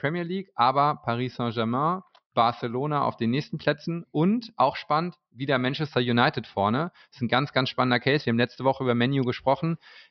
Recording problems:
high frequencies cut off; noticeable; nothing above 5.5 kHz

